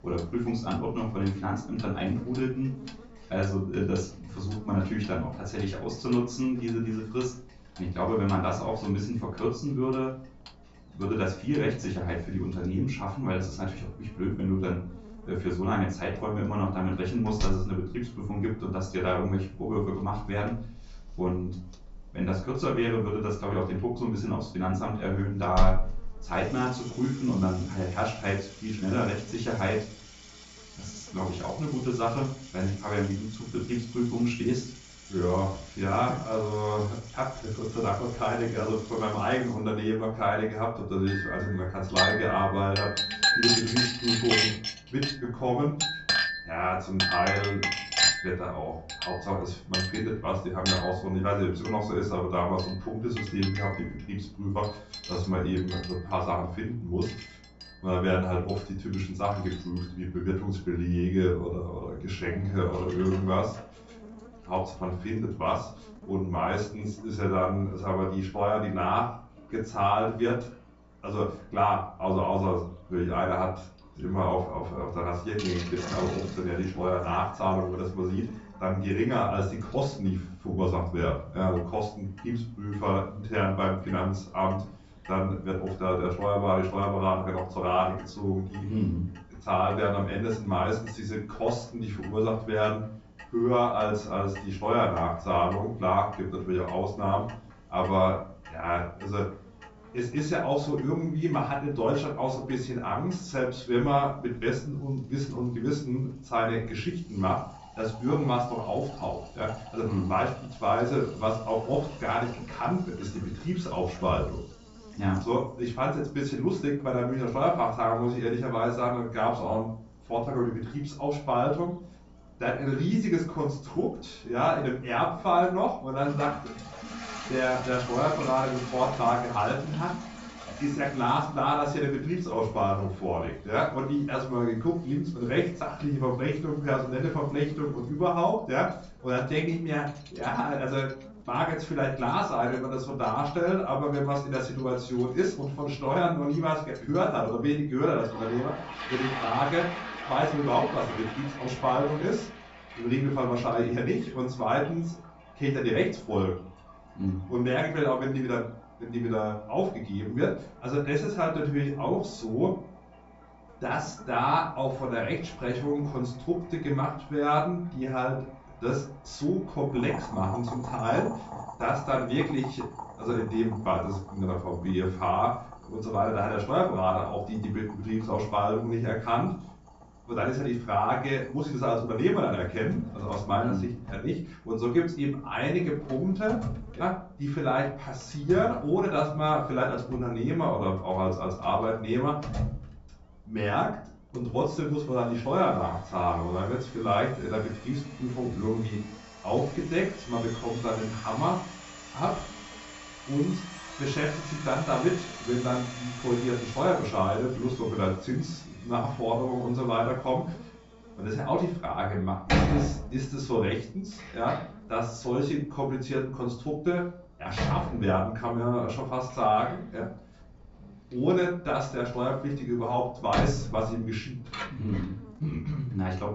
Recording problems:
off-mic speech; far
high frequencies cut off; noticeable; nothing above 8 kHz
room echo; slight; dies away in 0.4 s
household noises; loud; throughout; 6 dB below the speech
electrical hum; faint; throughout; 60 Hz, 30 dB below the speech

